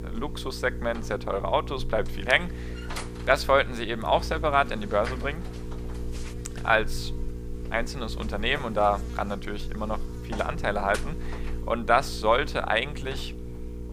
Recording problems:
electrical hum; noticeable; throughout; 60 Hz, 15 dB below the speech

